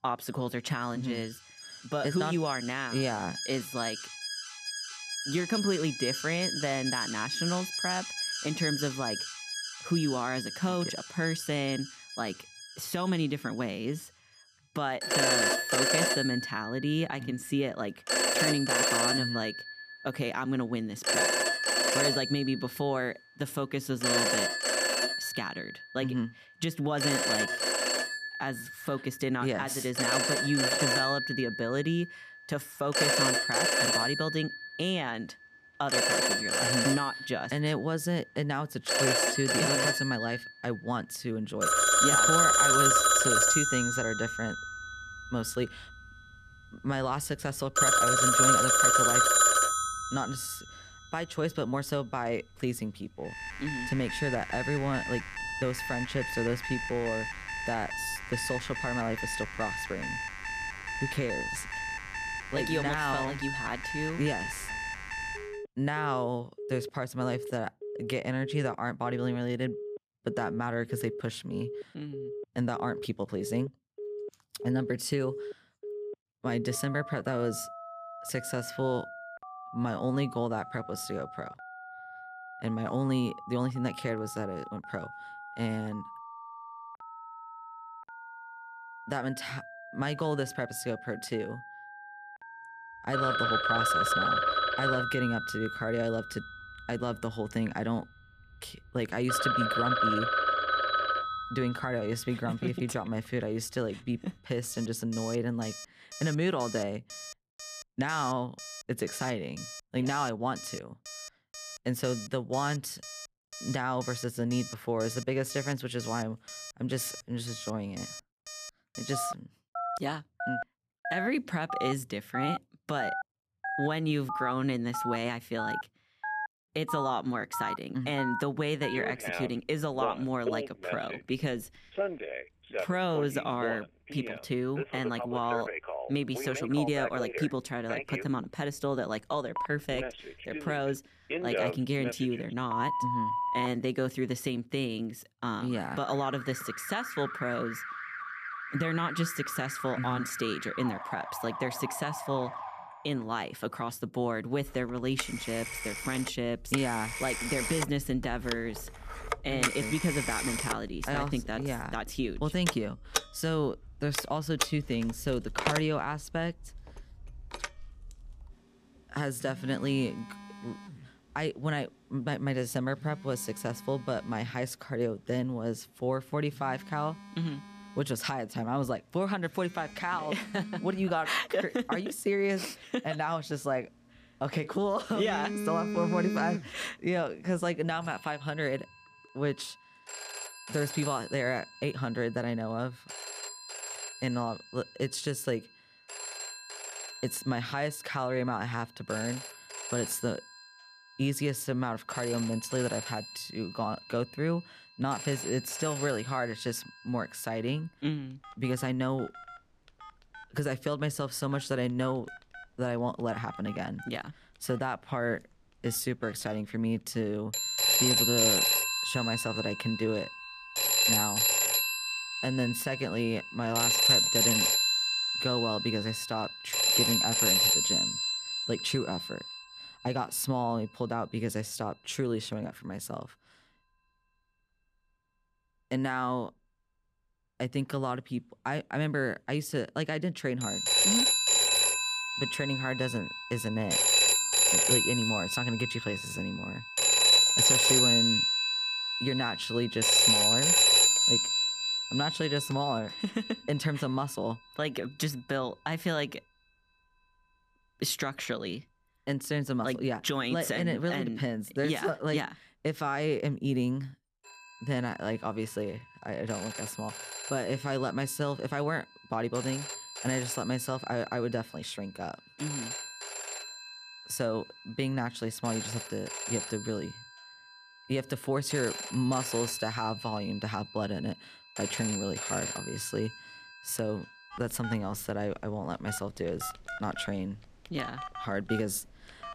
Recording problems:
alarms or sirens; very loud; throughout; 4 dB above the speech

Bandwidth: 14.5 kHz